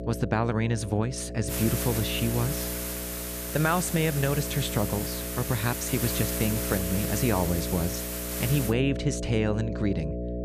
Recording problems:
electrical hum; loud; throughout; 60 Hz, 7 dB below the speech
hiss; loud; from 1.5 to 8.5 s; 4 dB below the speech

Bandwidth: 14.5 kHz